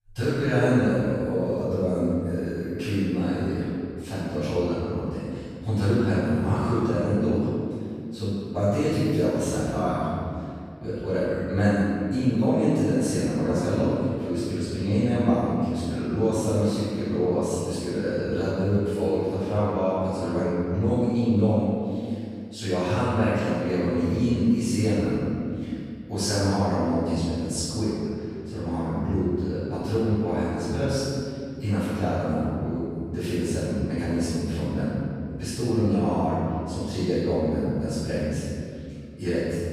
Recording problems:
room echo; strong; dies away in 2.5 s
off-mic speech; far

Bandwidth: 14.5 kHz